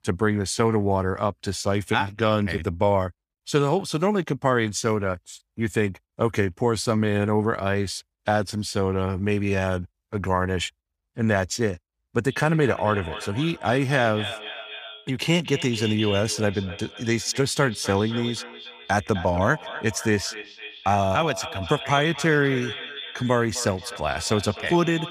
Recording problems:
echo of what is said; strong; from 12 s on; 260 ms later, 10 dB below the speech

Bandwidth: 15 kHz